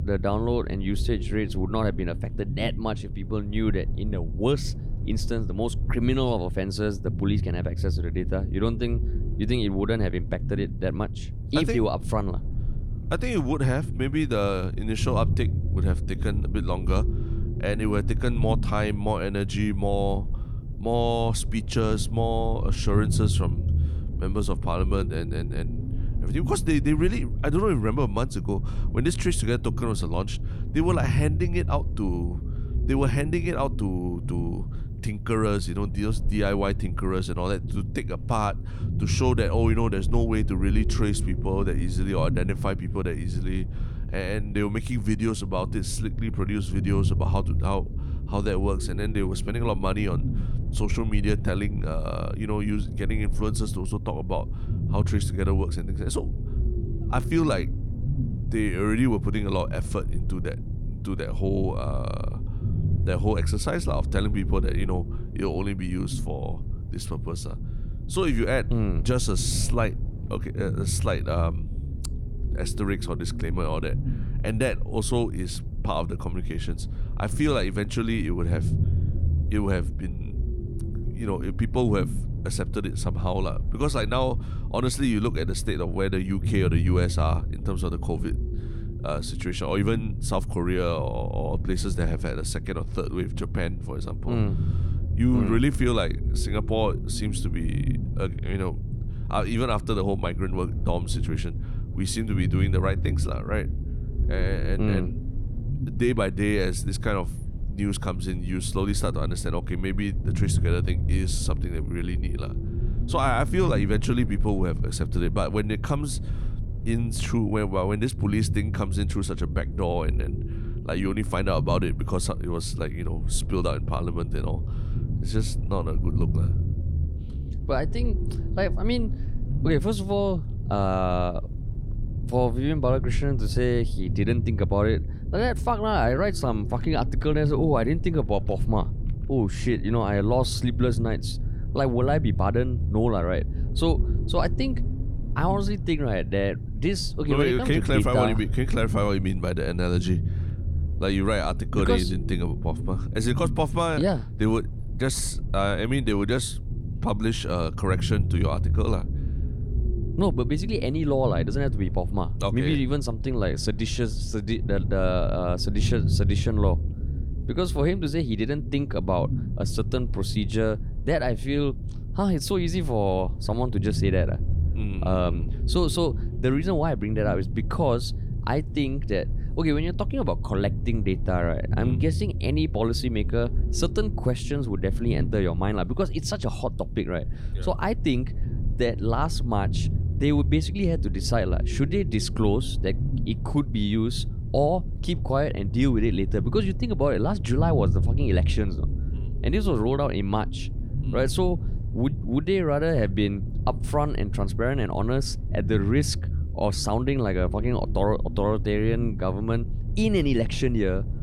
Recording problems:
low rumble; noticeable; throughout; 15 dB below the speech

